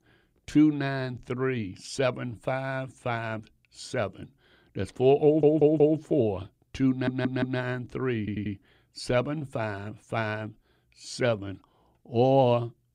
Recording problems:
audio stuttering; at 5.5 s, at 7 s and at 8 s

